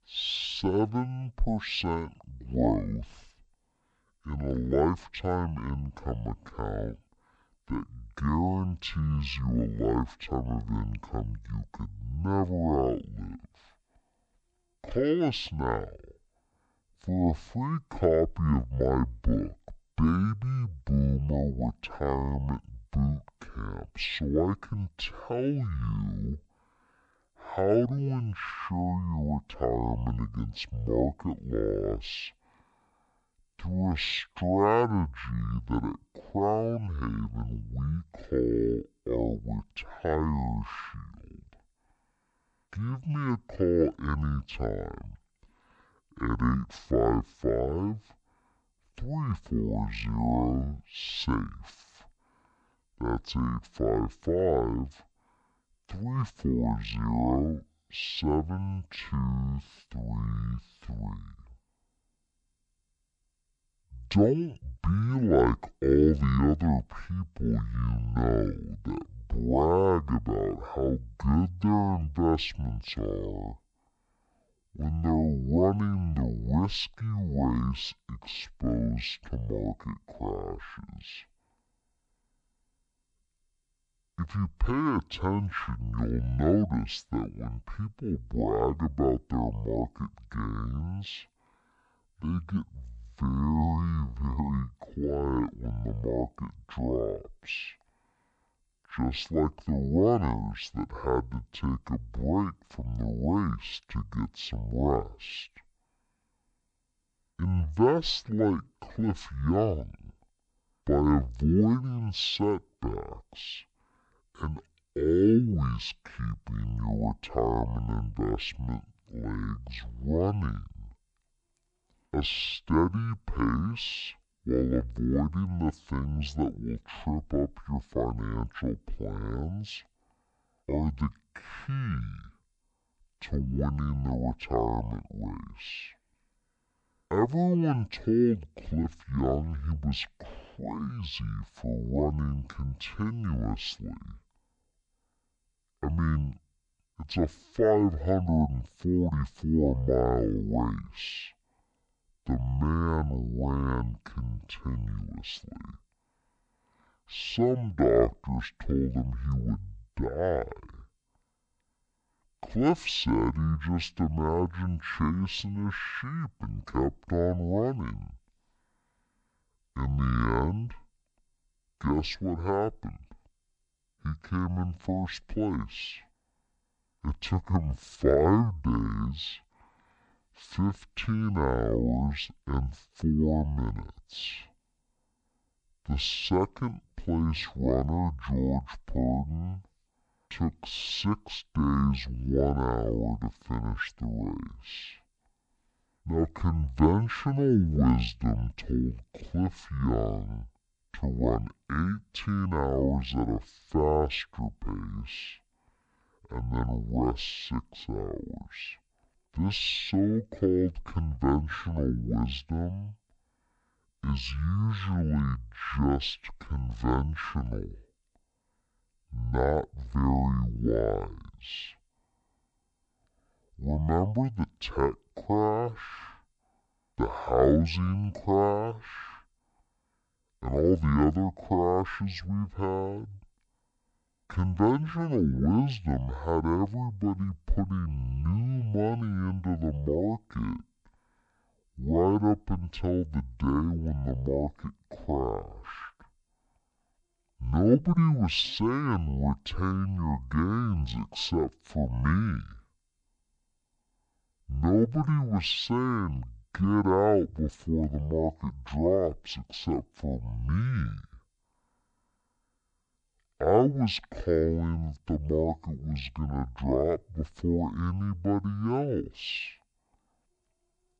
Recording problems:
wrong speed and pitch; too slow and too low; 0.5 times normal speed

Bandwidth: 10.5 kHz